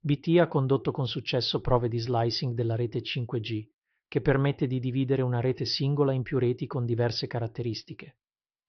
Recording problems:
high frequencies cut off; noticeable; nothing above 5.5 kHz

